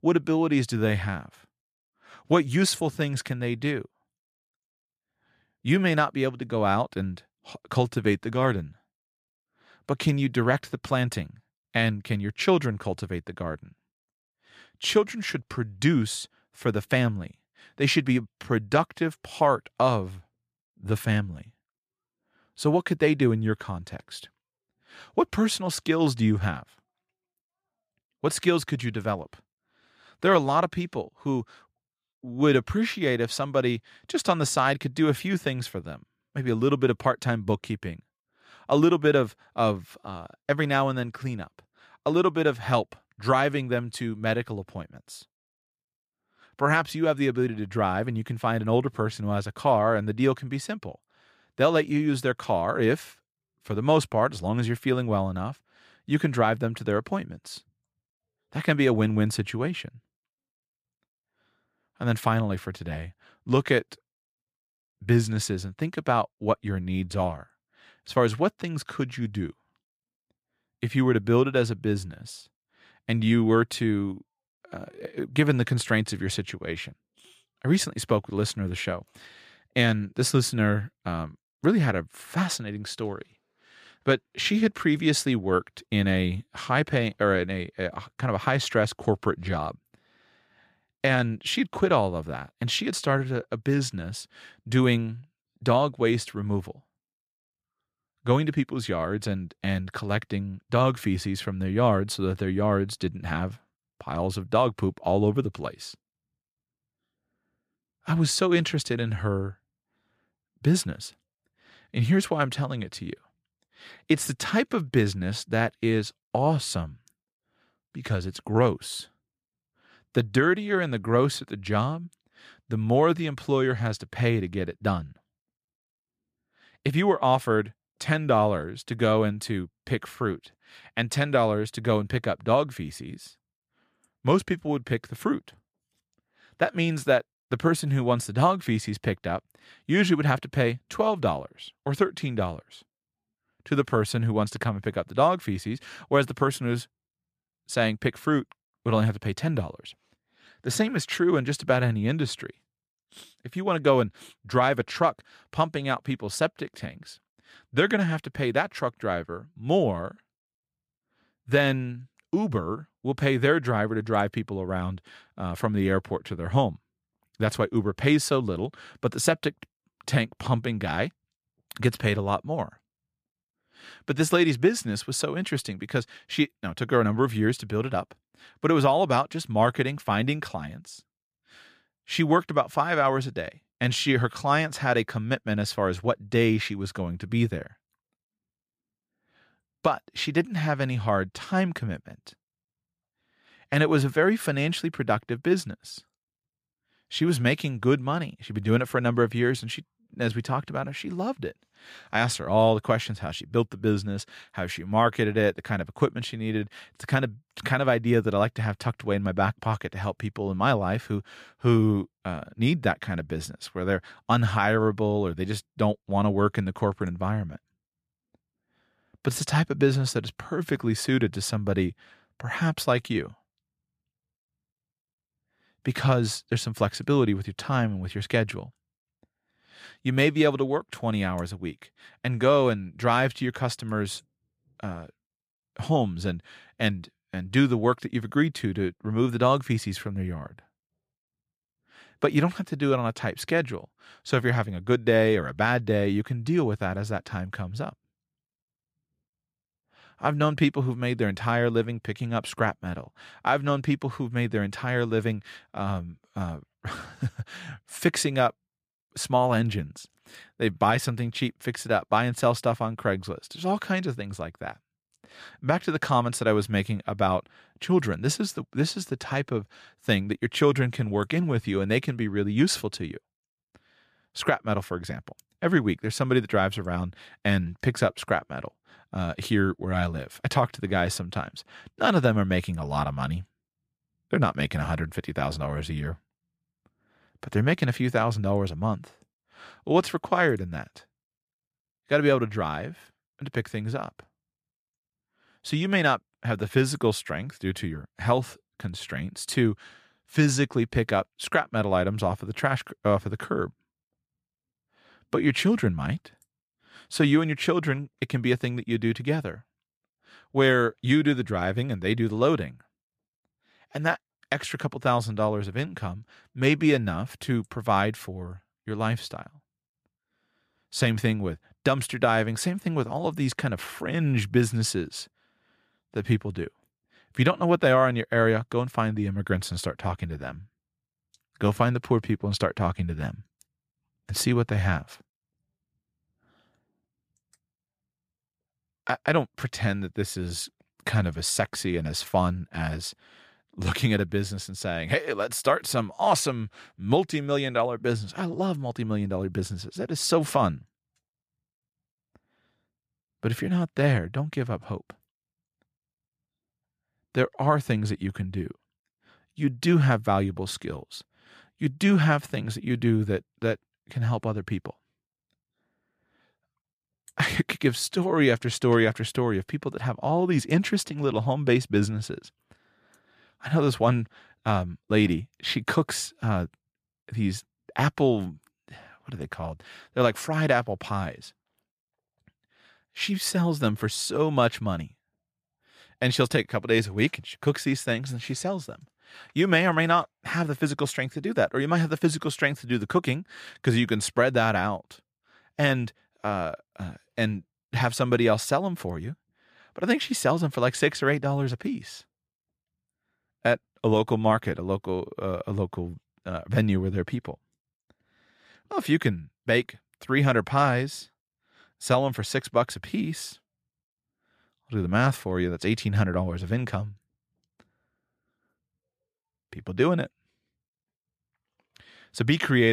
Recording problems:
abrupt cut into speech; at the end

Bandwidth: 14.5 kHz